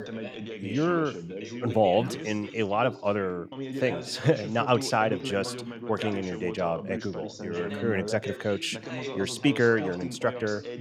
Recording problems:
background chatter; loud; throughout; 2 voices, 9 dB below the speech

